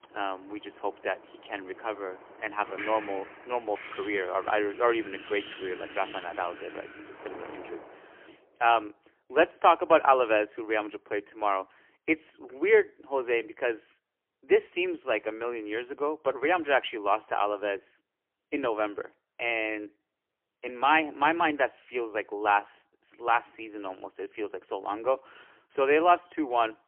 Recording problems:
phone-call audio; poor line; nothing above 3 kHz
wind in the background; noticeable; until 7.5 s; 15 dB below the speech

